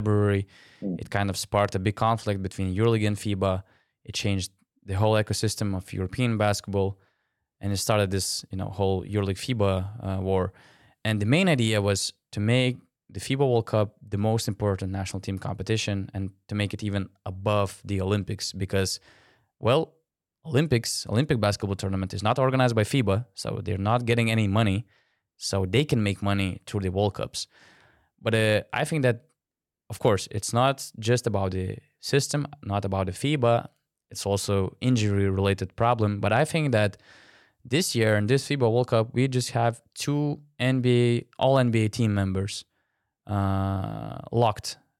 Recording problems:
abrupt cut into speech; at the start

